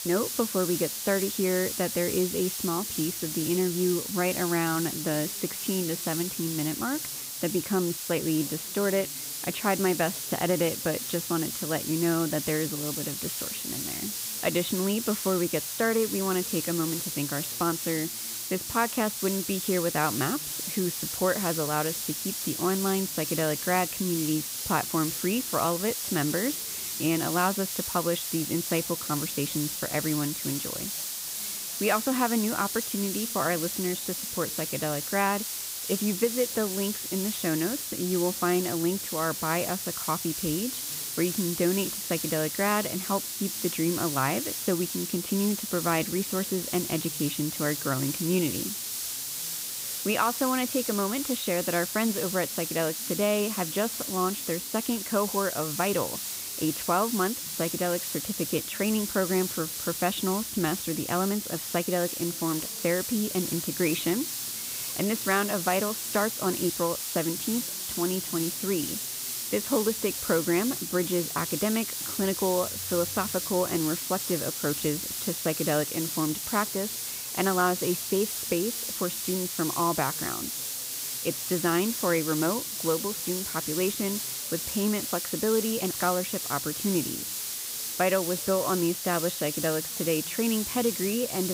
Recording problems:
high frequencies cut off; severe; nothing above 4 kHz
hiss; loud; throughout; 2 dB below the speech
voice in the background; faint; throughout; 25 dB below the speech
abrupt cut into speech; at the end

